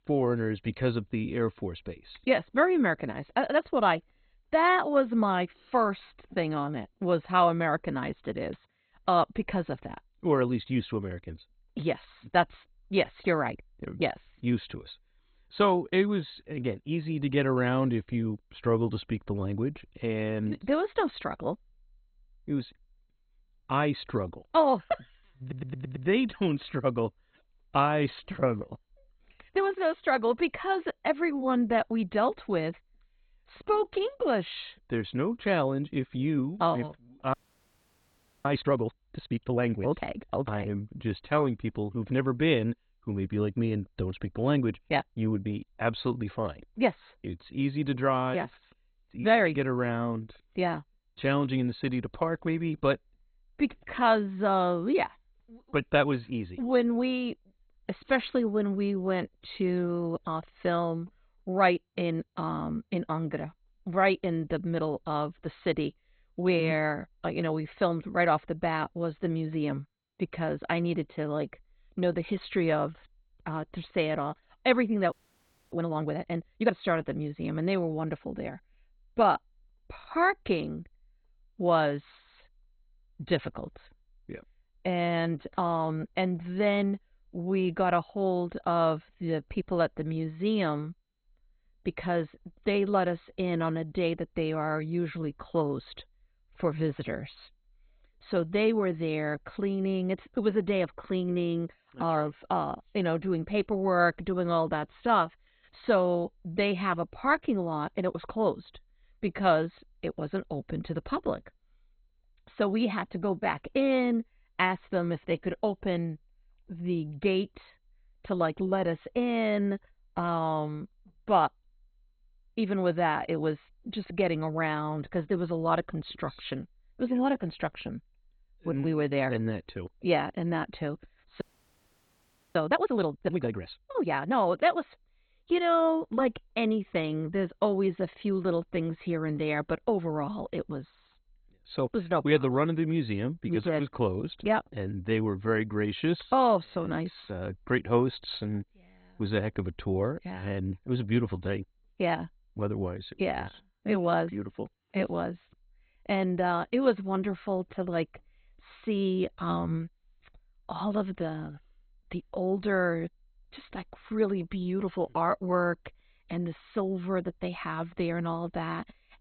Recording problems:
garbled, watery; badly; nothing above 4 kHz
audio stuttering; at 25 s
audio freezing; at 37 s for 1 s, at 1:15 for 0.5 s and at 2:11 for 1 s

